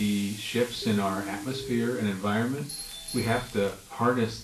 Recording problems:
off-mic speech; far
room echo; slight; dies away in 0.3 s
garbled, watery; slightly; nothing above 12.5 kHz
hiss; noticeable; throughout; 15 dB below the speech
crackling; faint; at 3 s; 20 dB below the speech
abrupt cut into speech; at the start
siren; noticeable; from 1 to 2 s; peak 10 dB below the speech
doorbell; noticeable; from 2.5 to 4 s; peak 7 dB below the speech

